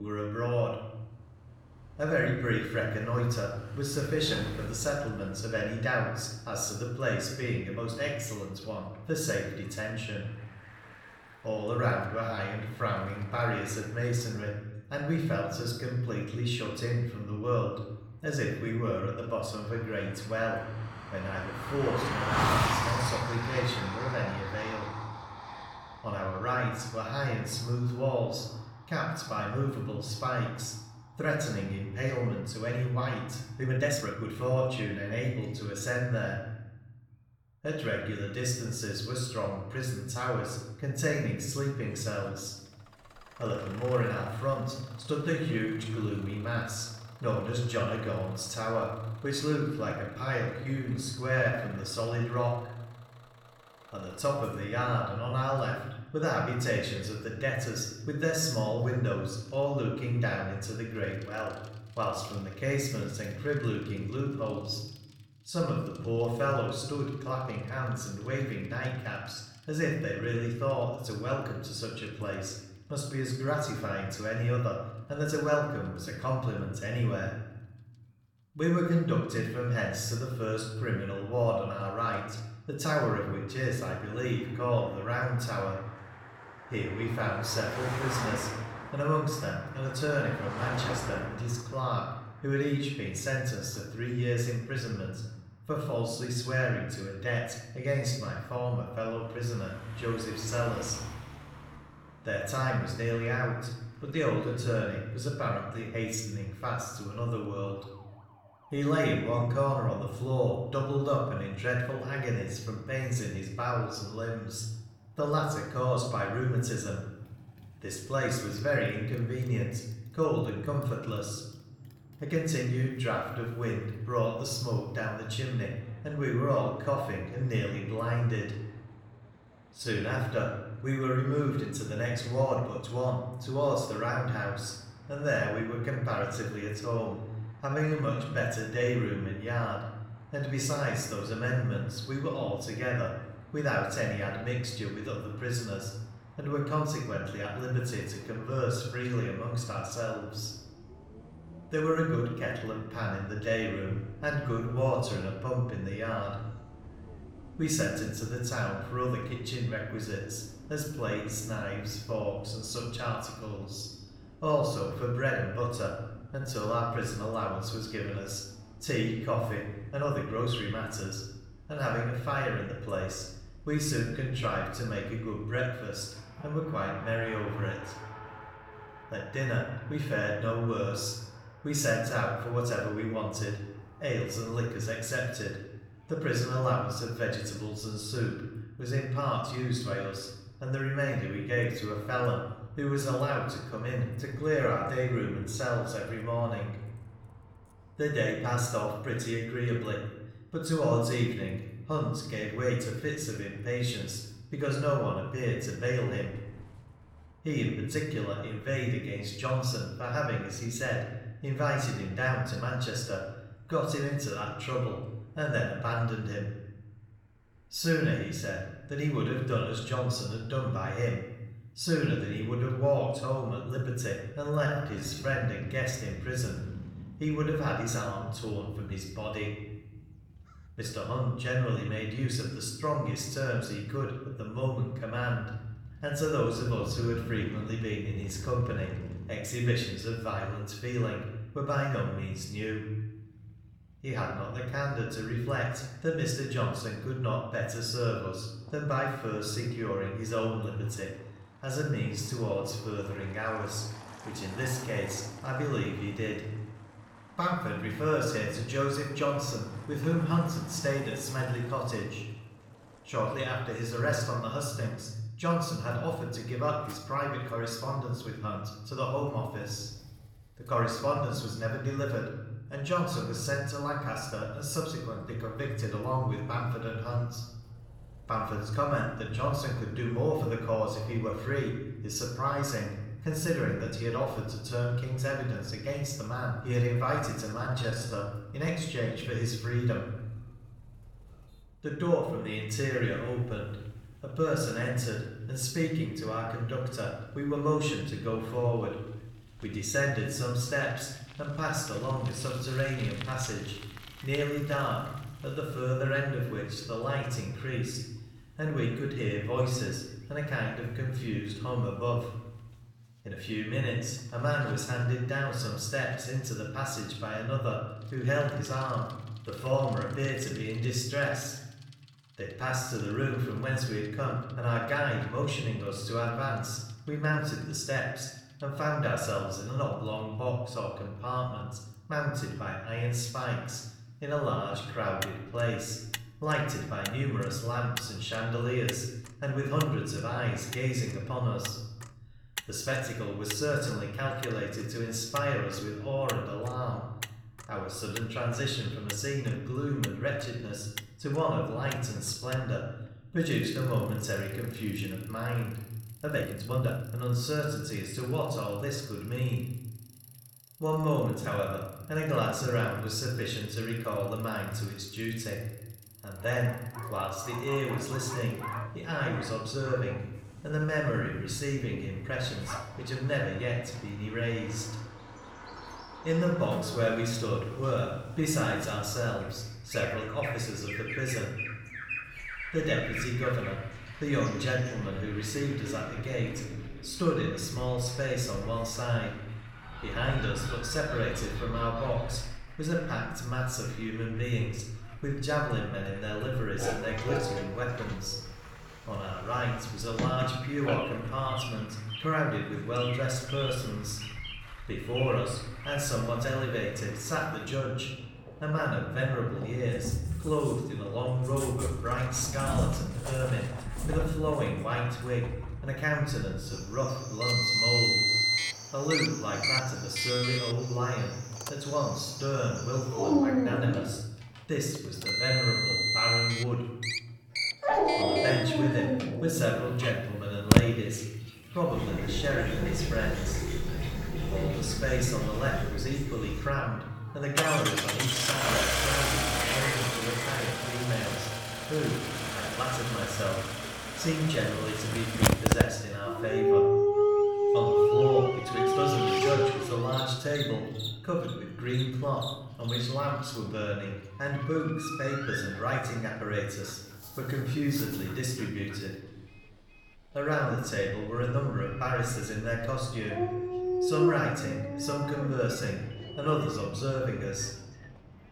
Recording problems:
off-mic speech; far
room echo; noticeable; dies away in 1.1 s
traffic noise; loud; throughout; 4 dB below the speech
animal sounds; loud; from 6:07 on; 1 dB below the speech
abrupt cut into speech; at the start
uneven, jittery; strongly; from 34 s to 7:41

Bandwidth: 17.5 kHz